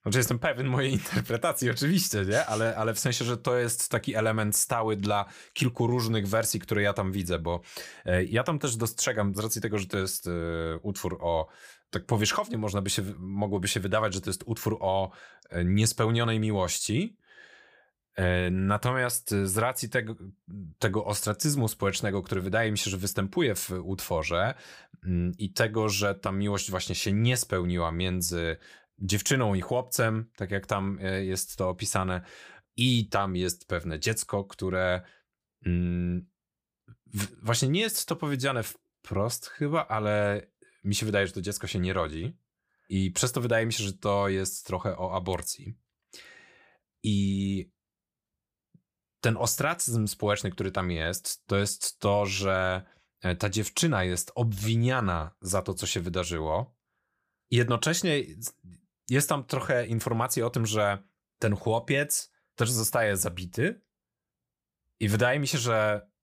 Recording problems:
none

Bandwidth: 15 kHz